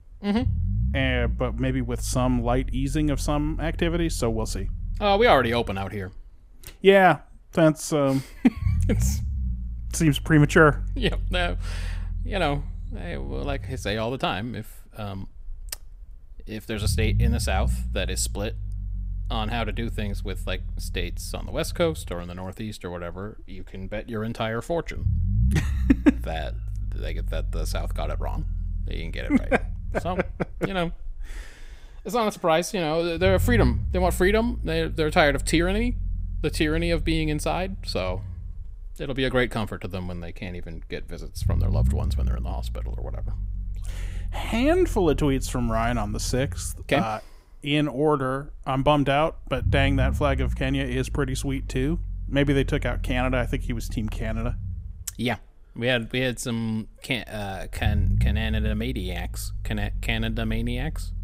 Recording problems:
low rumble; faint; throughout; 20 dB below the speech

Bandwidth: 15.5 kHz